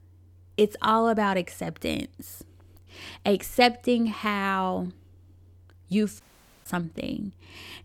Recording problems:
audio cutting out; at 6 s

